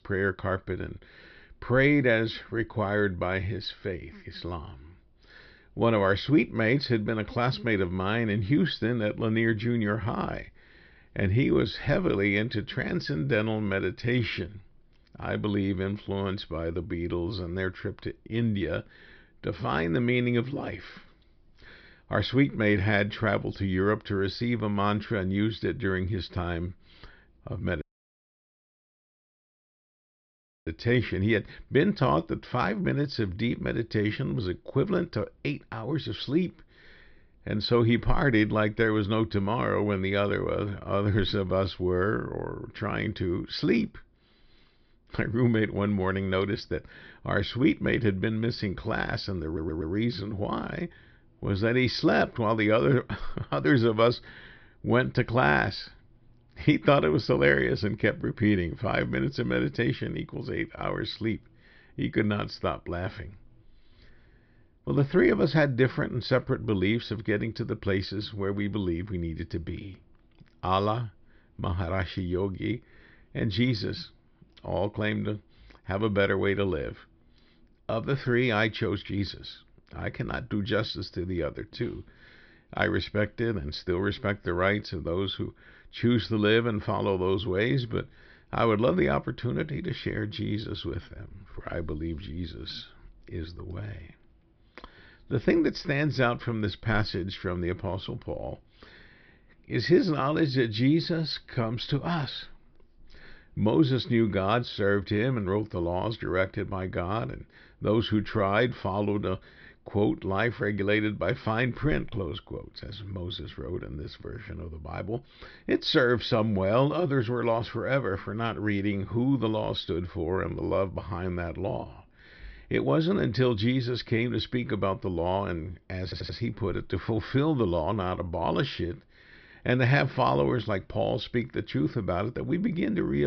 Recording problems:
high frequencies cut off; noticeable; nothing above 5.5 kHz
audio cutting out; at 28 s for 3 s
audio stuttering; at 49 s and at 2:06
abrupt cut into speech; at the end

